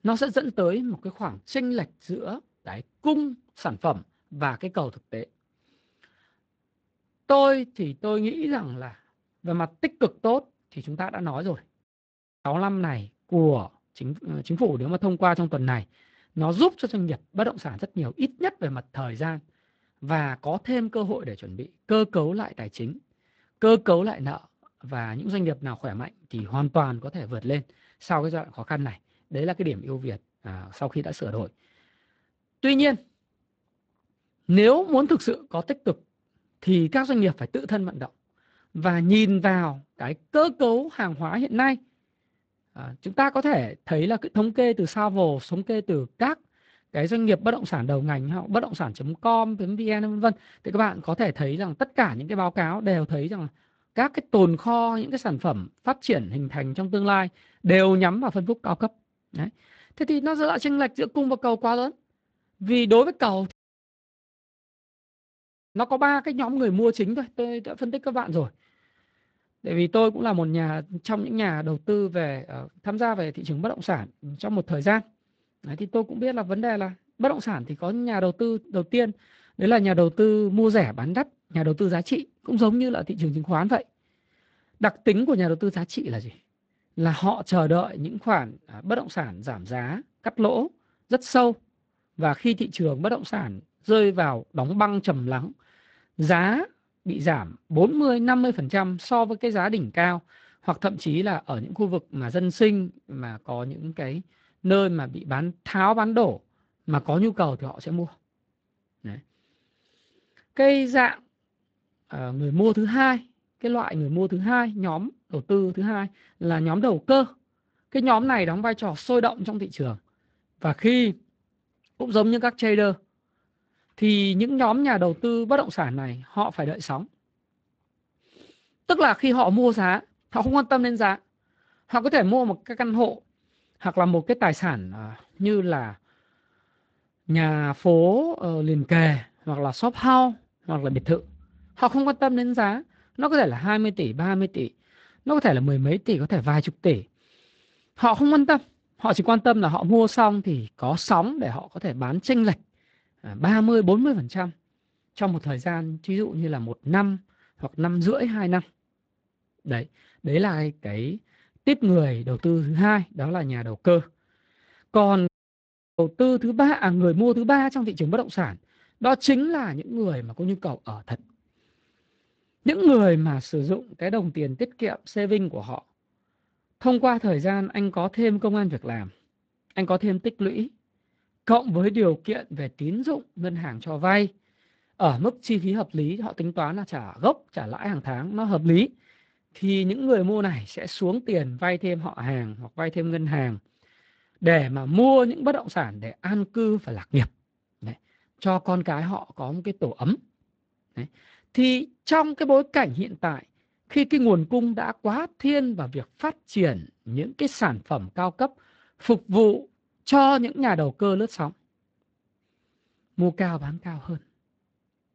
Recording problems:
garbled, watery; slightly; nothing above 7.5 kHz
audio cutting out; at 12 s for 0.5 s, at 1:04 for 2 s and at 2:45 for 0.5 s

